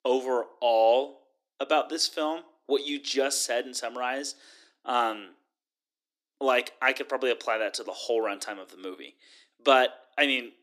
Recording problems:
thin; somewhat; fading below 300 Hz

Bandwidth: 14.5 kHz